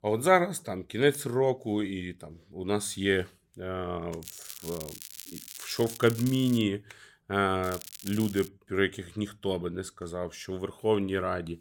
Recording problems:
crackling; noticeable; from 4 to 6.5 s and at 7.5 s; 15 dB below the speech

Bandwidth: 17.5 kHz